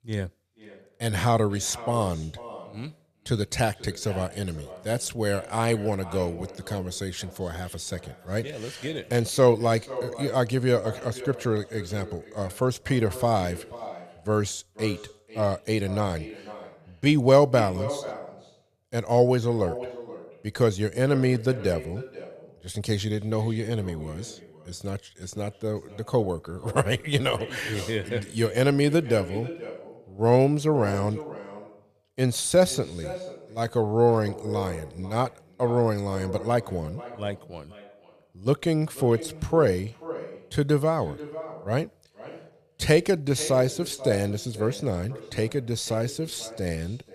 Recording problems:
echo of what is said; noticeable; throughout; 490 ms later, 15 dB below the speech

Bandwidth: 14.5 kHz